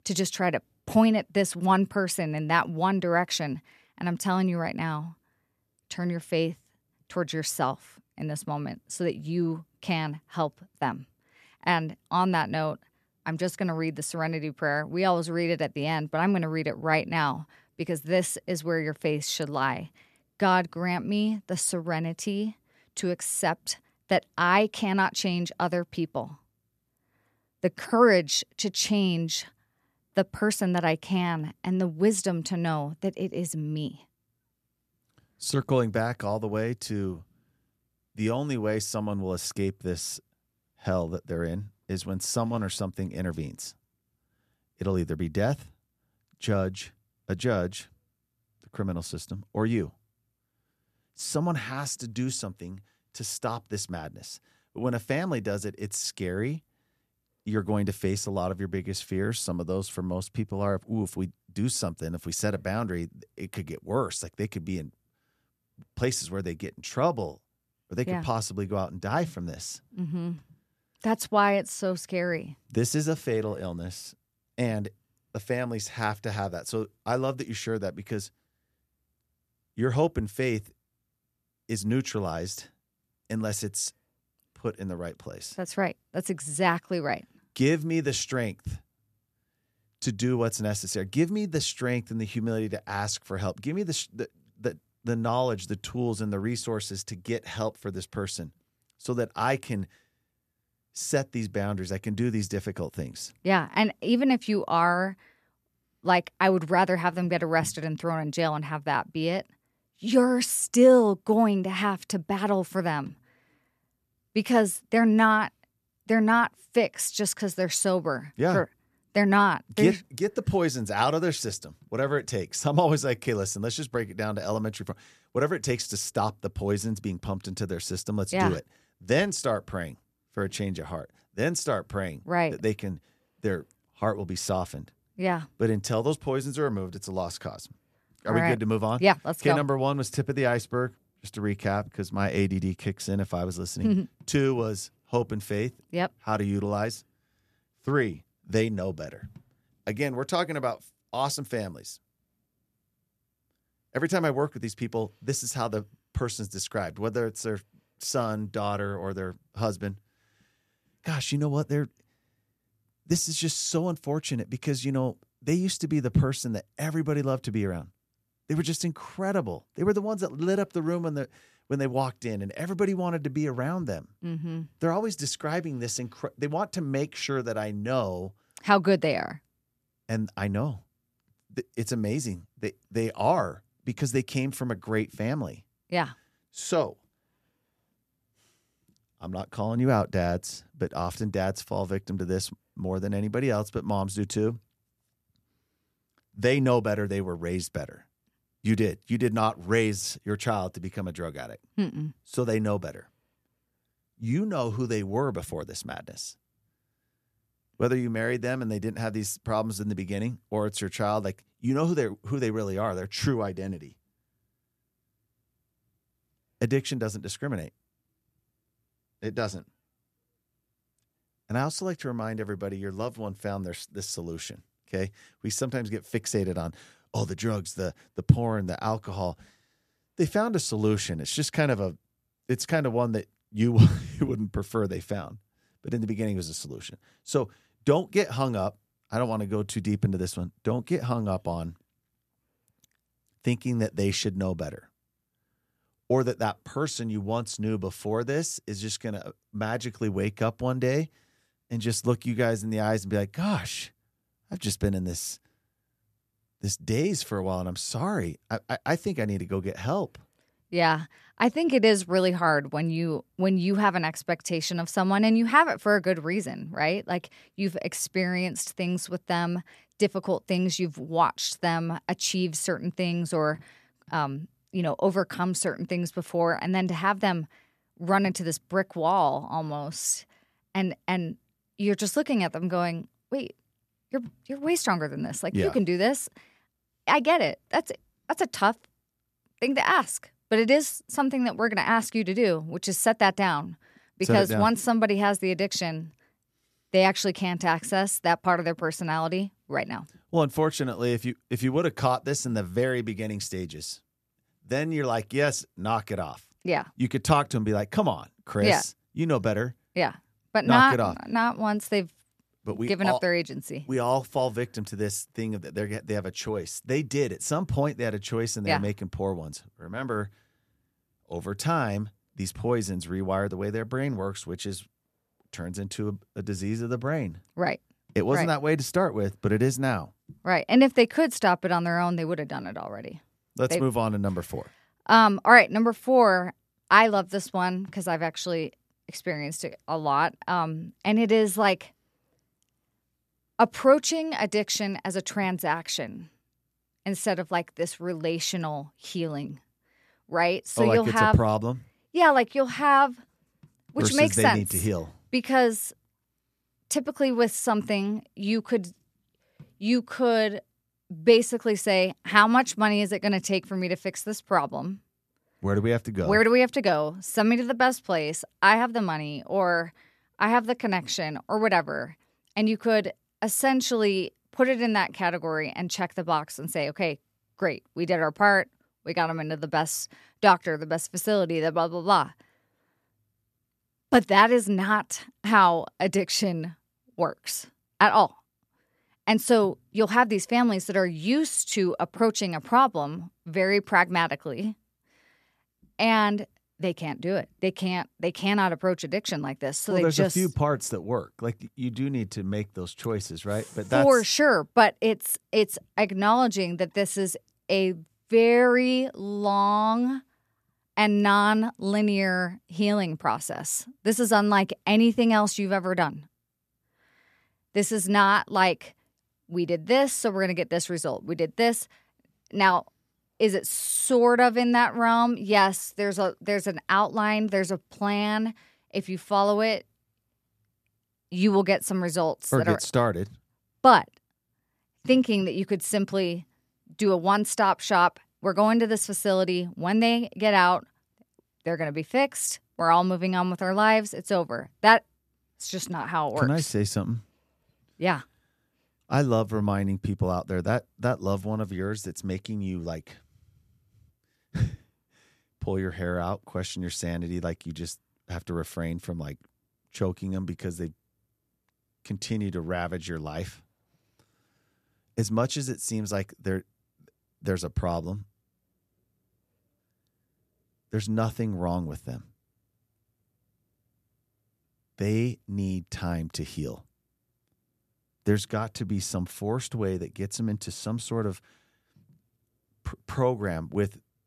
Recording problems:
none

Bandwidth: 14 kHz